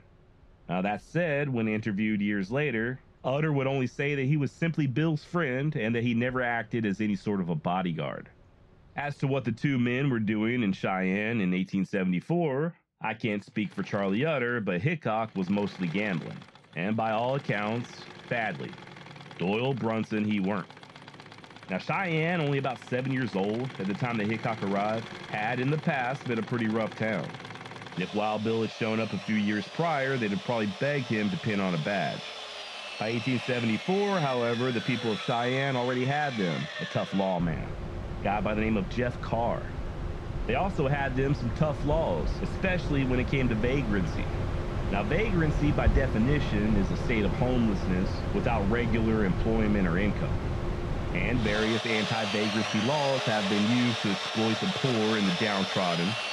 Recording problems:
muffled; slightly; fading above 3.5 kHz
machinery noise; loud; throughout; 6 dB below the speech

